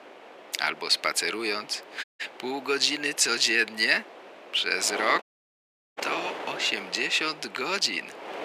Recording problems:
thin; very; fading below 400 Hz
wind noise on the microphone; occasional gusts; 15 dB below the speech
audio cutting out; at 2 s and at 5 s for 0.5 s

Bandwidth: 15 kHz